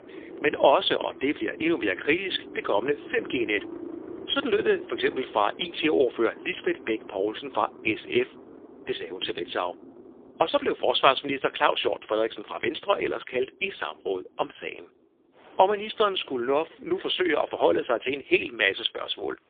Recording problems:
phone-call audio; poor line
traffic noise; noticeable; throughout; 15 dB below the speech

